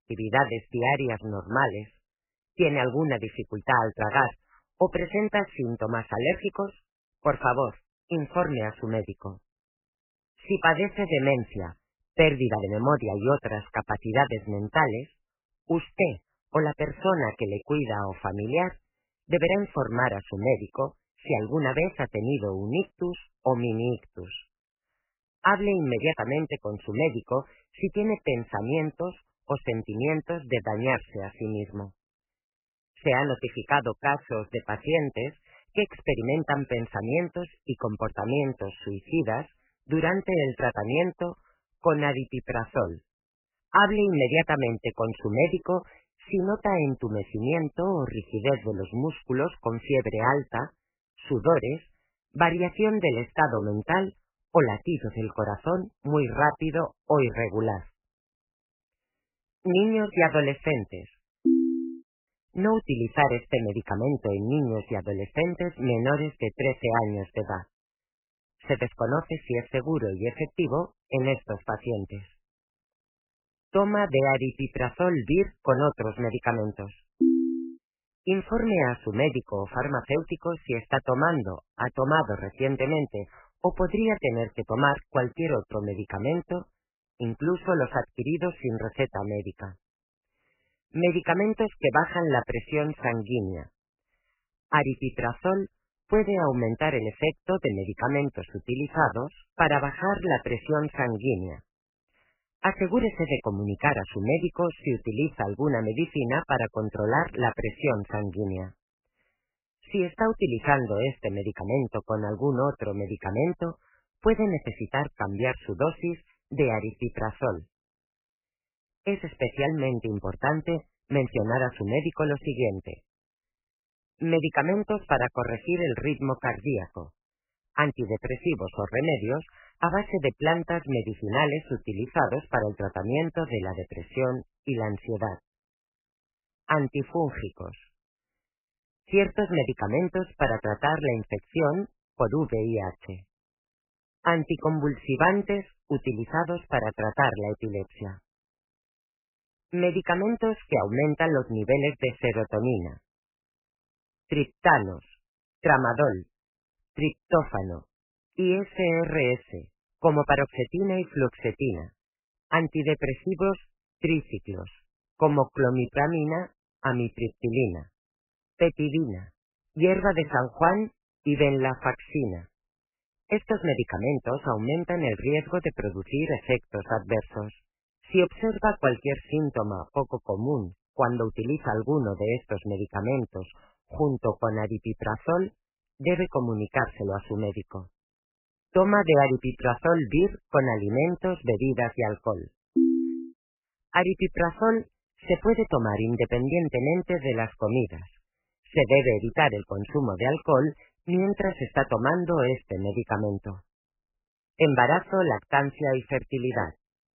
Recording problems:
garbled, watery; badly; nothing above 3 kHz

